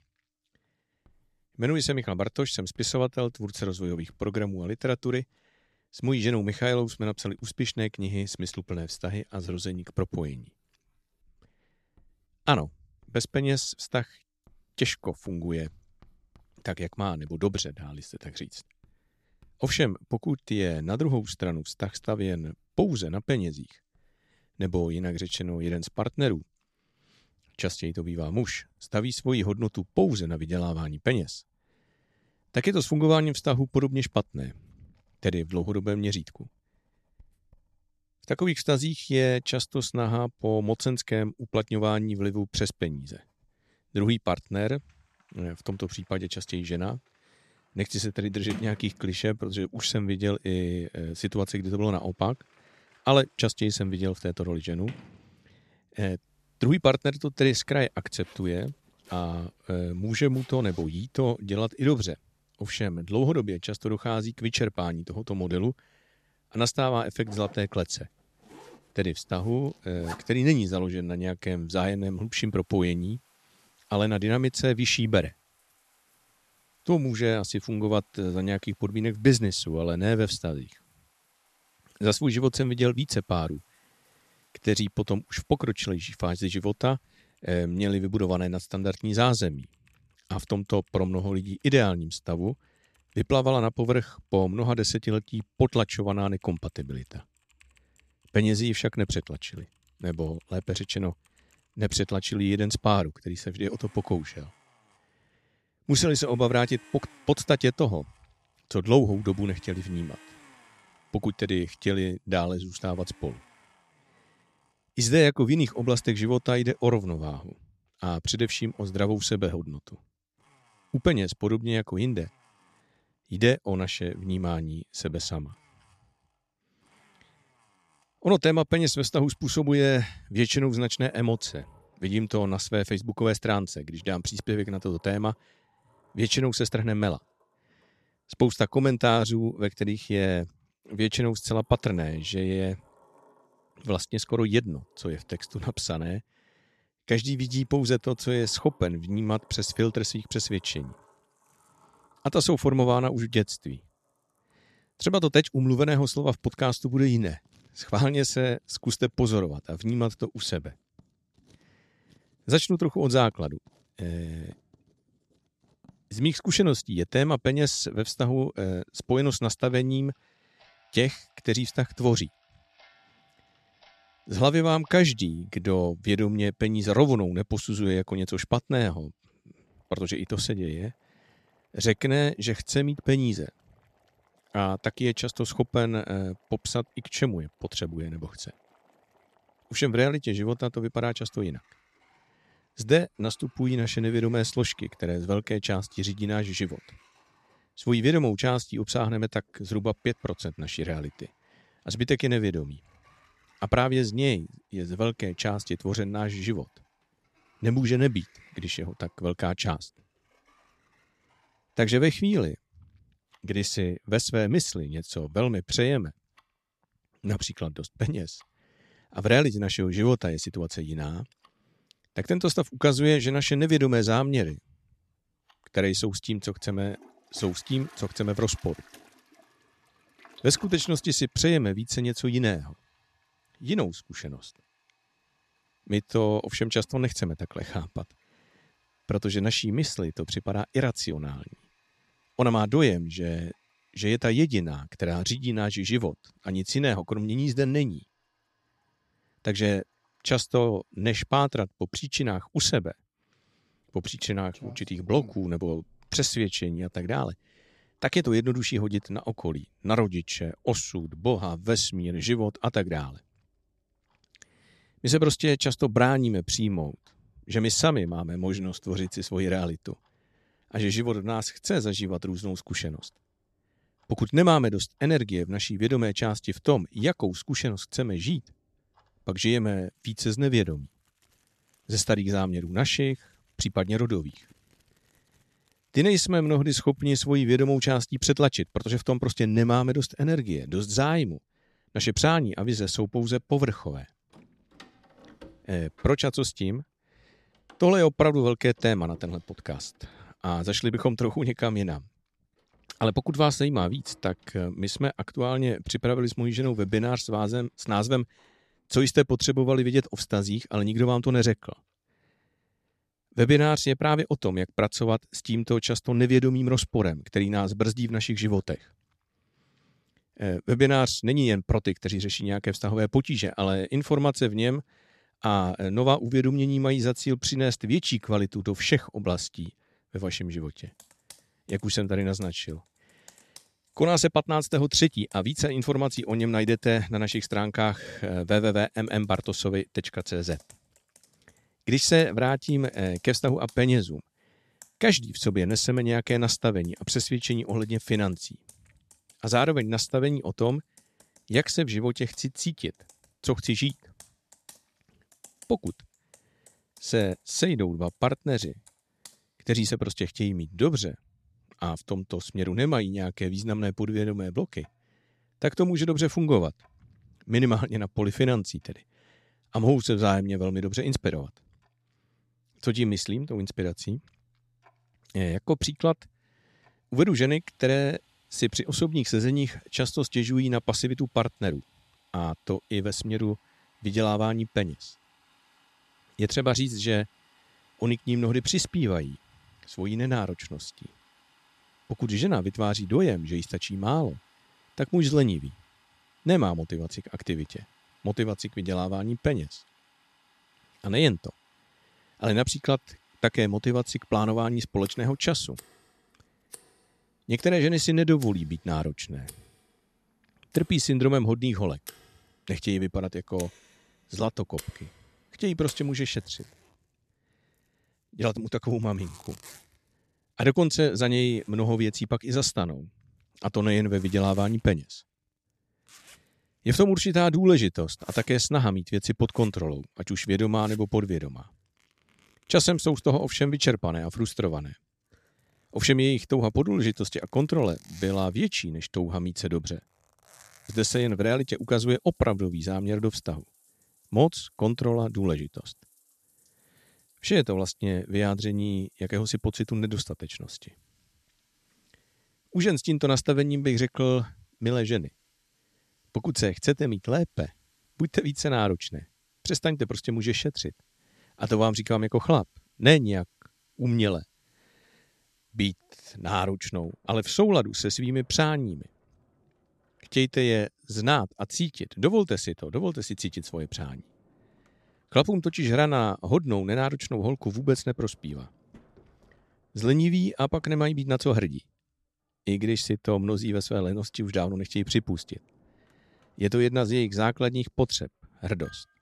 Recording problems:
household noises; faint; throughout; 30 dB below the speech

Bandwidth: 13.5 kHz